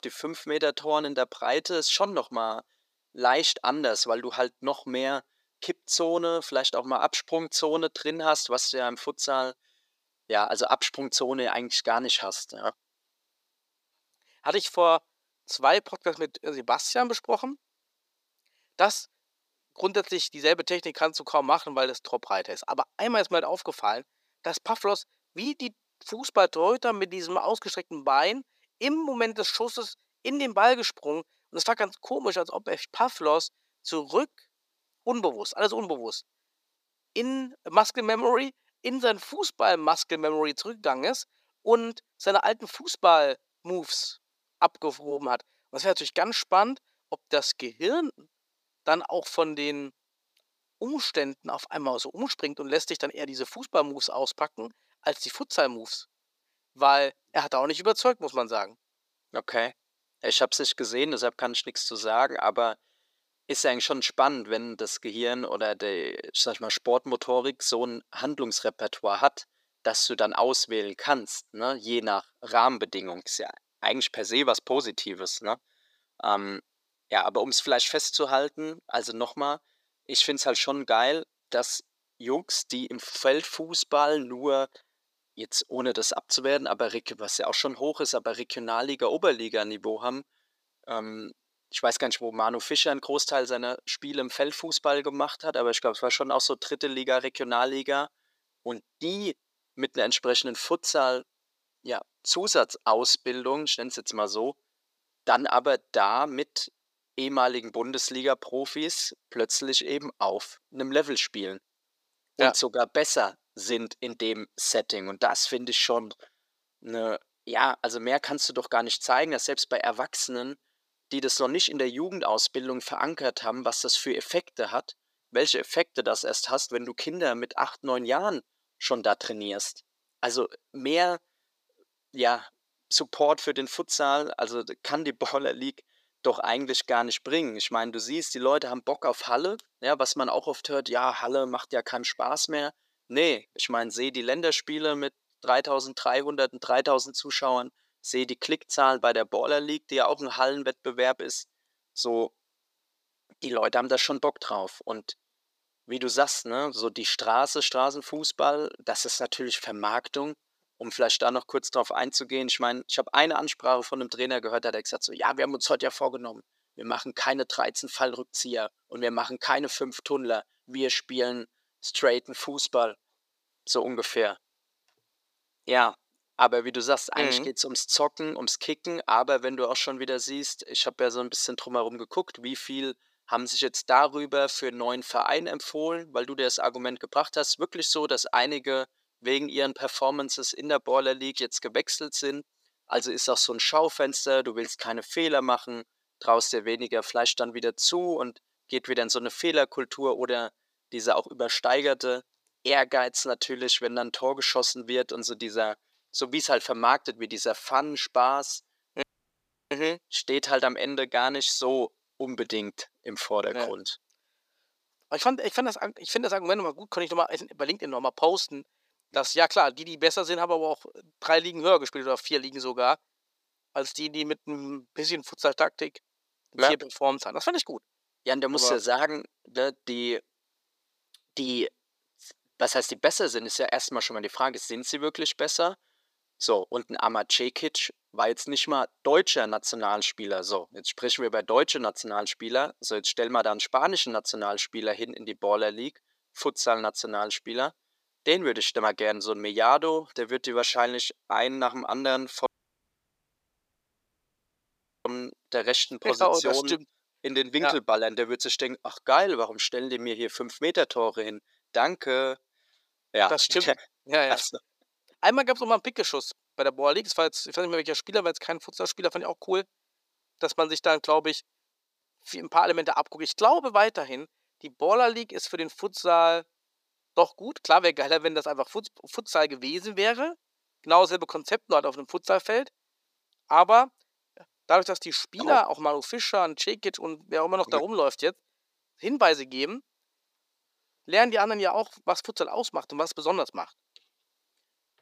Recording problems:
thin; somewhat; fading below 400 Hz
audio cutting out; at 3:29 for 0.5 s and at 4:12 for 2.5 s

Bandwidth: 15 kHz